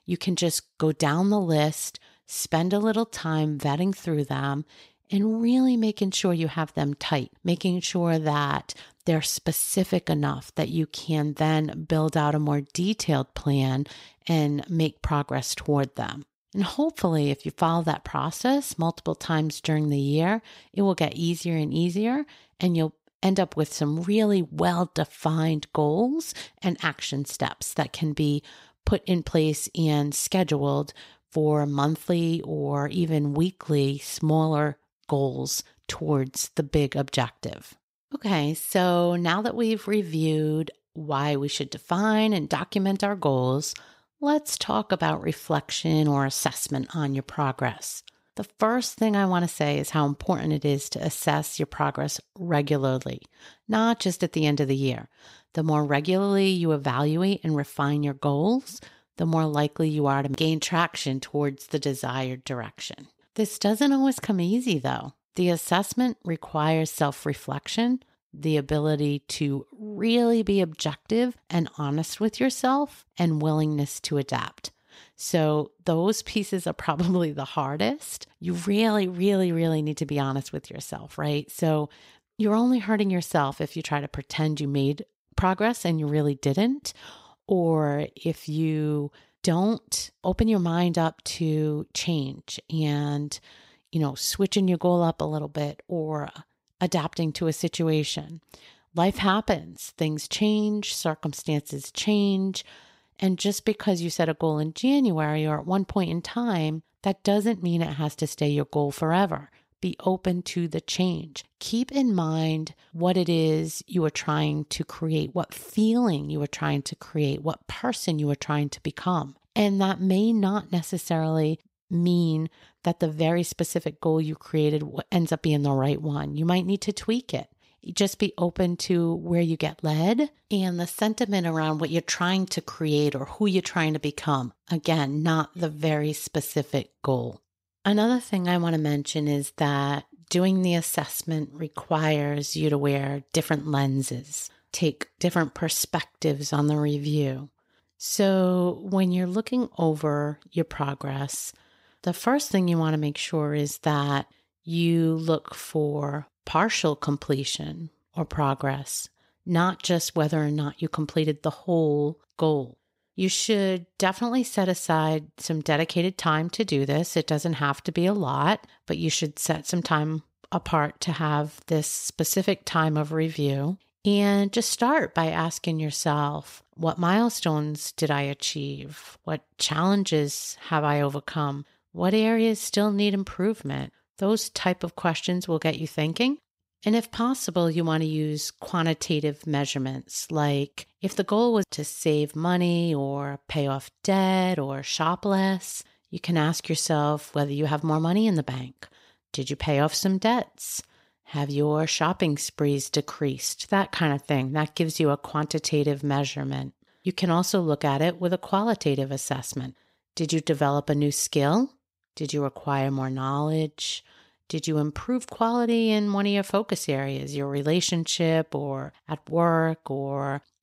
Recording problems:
none

